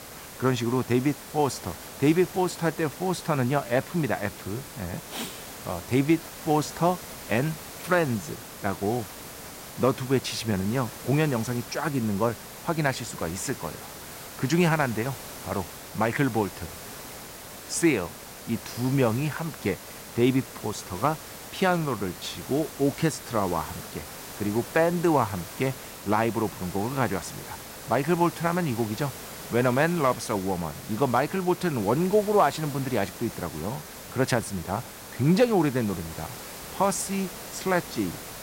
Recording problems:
hiss; noticeable; throughout; 10 dB below the speech

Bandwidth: 16 kHz